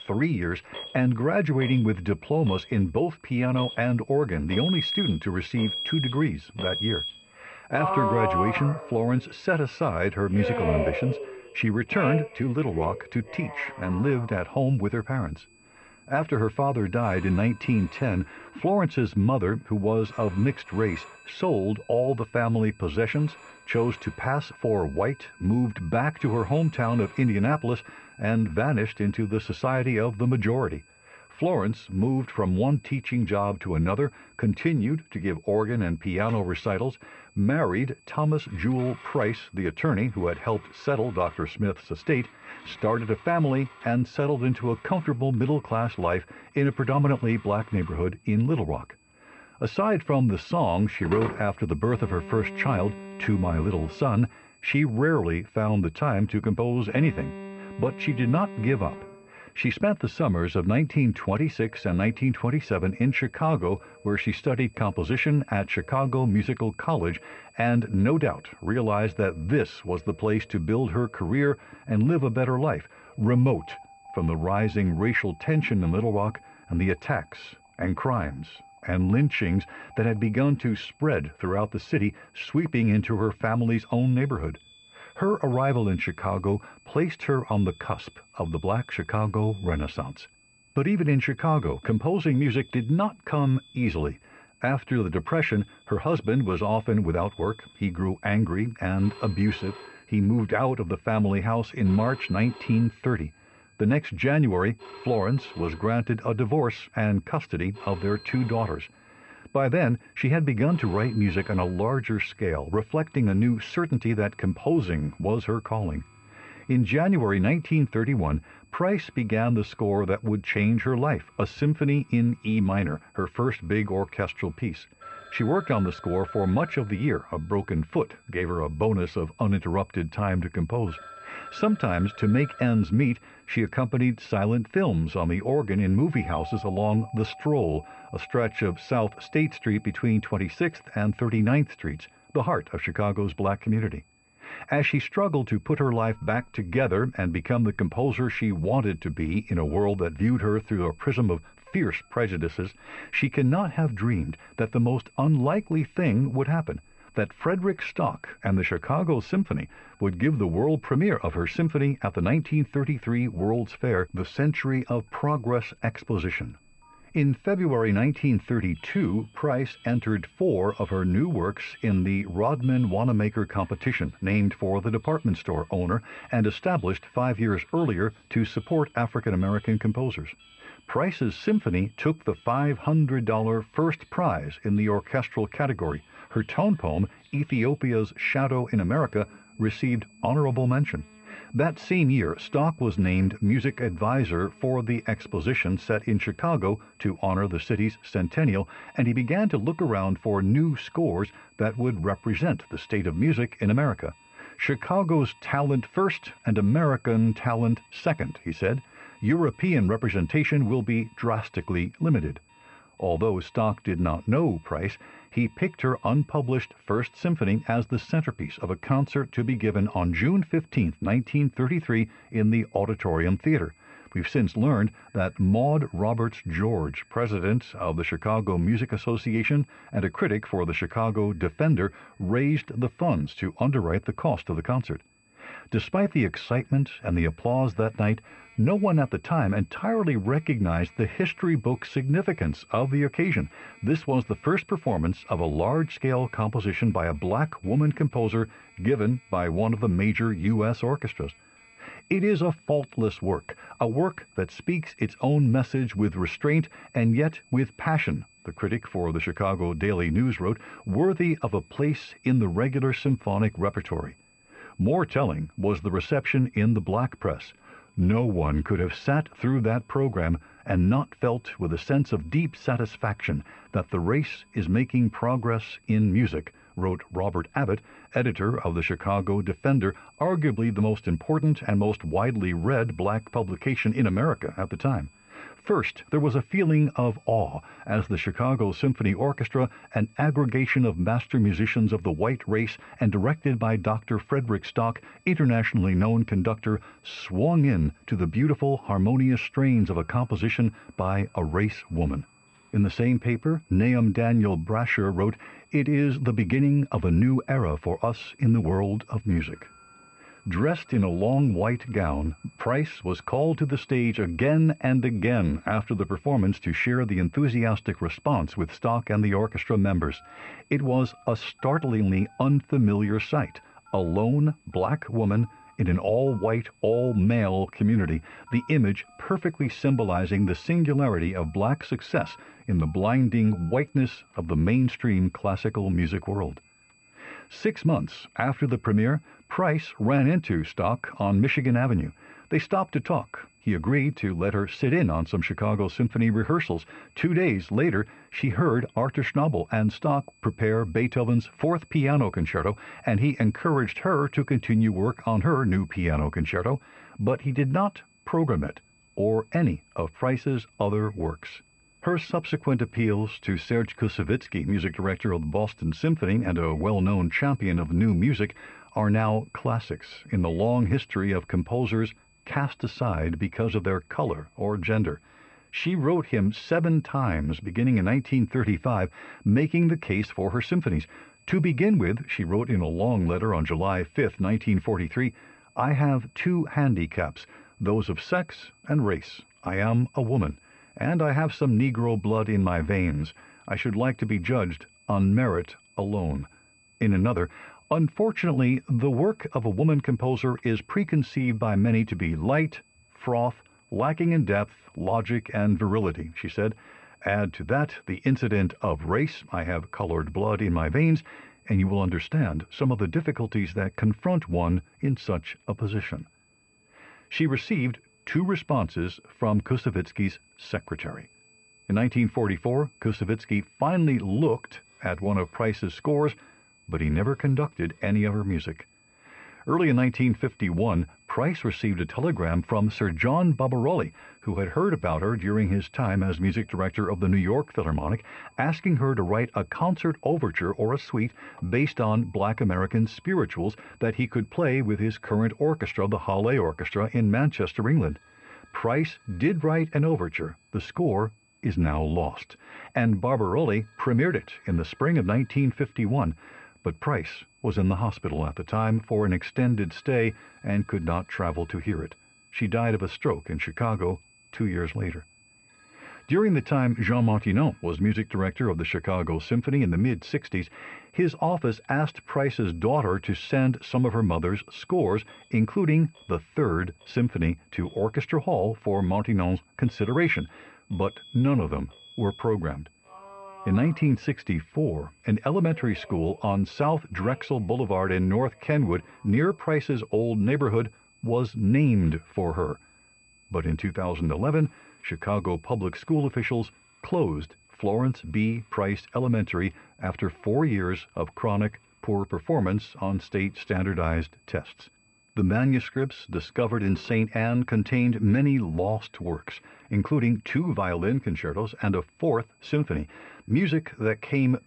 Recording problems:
muffled; very; fading above 3 kHz
alarms or sirens; noticeable; throughout; 15 dB below the speech
high-pitched whine; faint; throughout; 2.5 kHz, 35 dB below the speech

